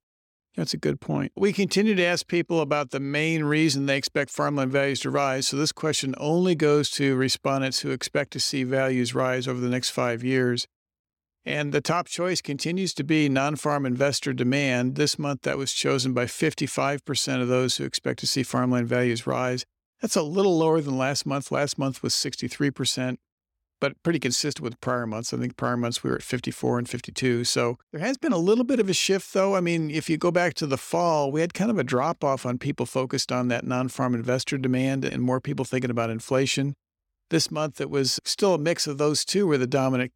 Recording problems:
none

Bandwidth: 17 kHz